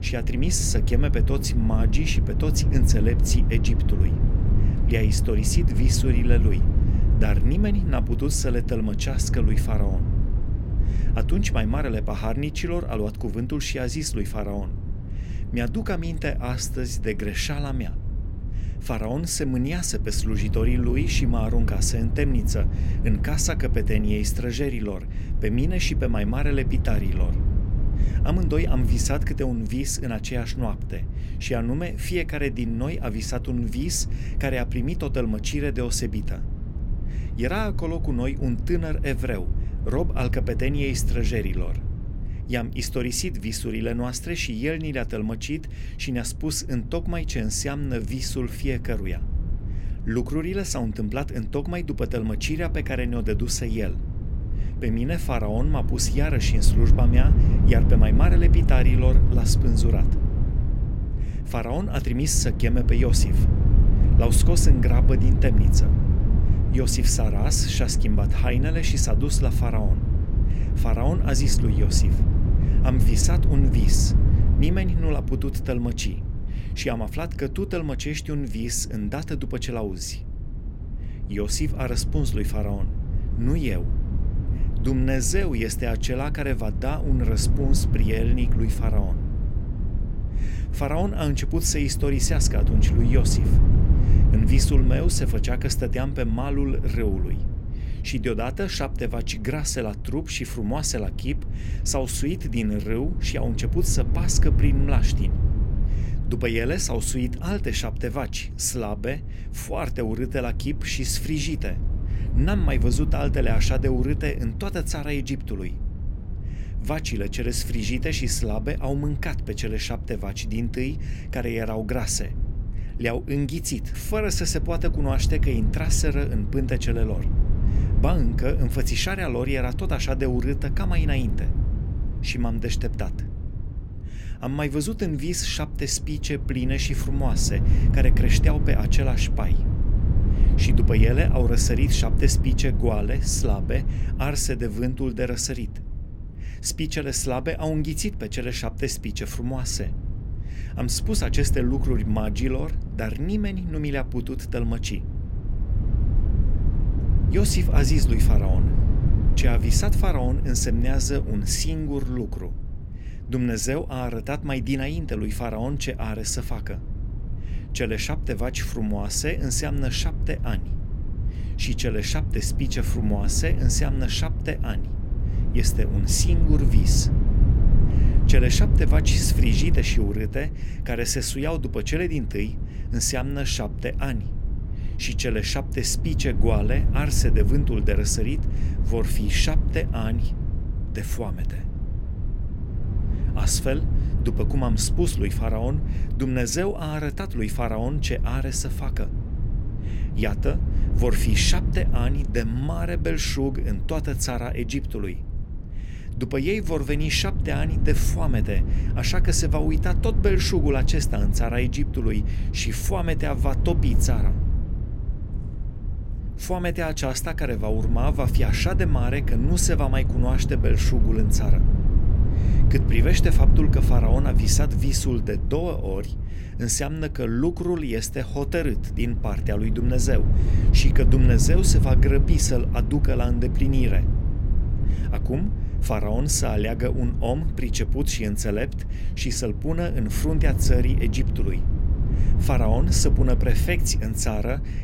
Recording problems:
wind noise on the microphone; heavy; 10 dB below the speech

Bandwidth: 16 kHz